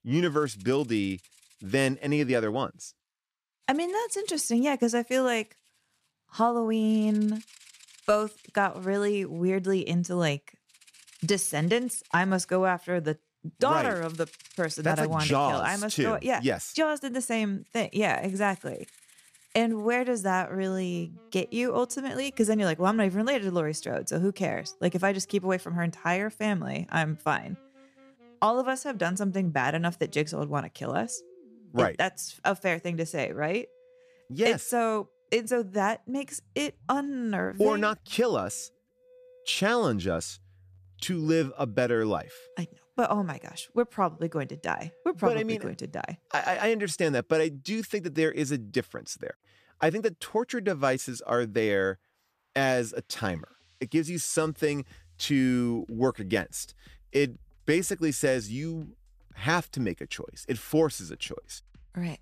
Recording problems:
background music; faint; throughout; 30 dB below the speech

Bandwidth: 14.5 kHz